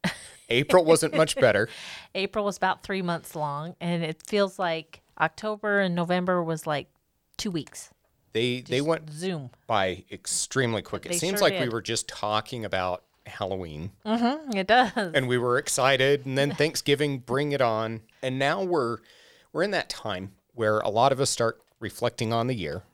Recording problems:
none

